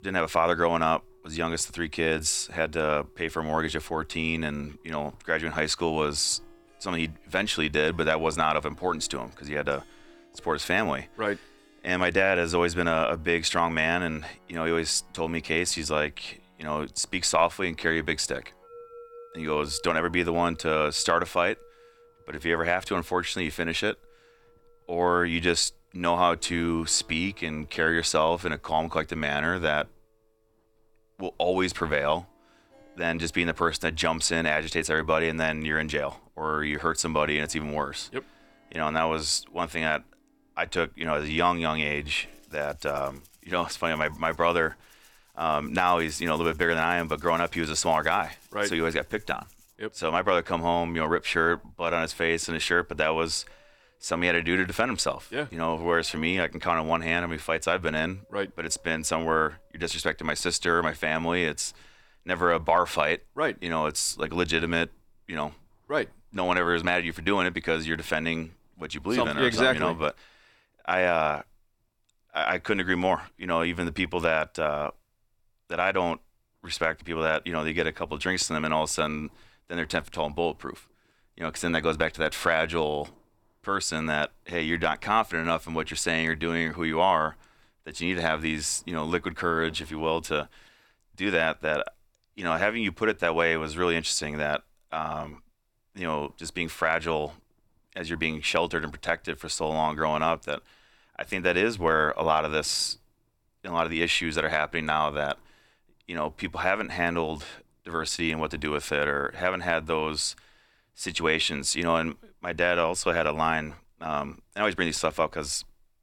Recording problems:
background music; faint; until 1:00; 30 dB below the speech

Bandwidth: 18 kHz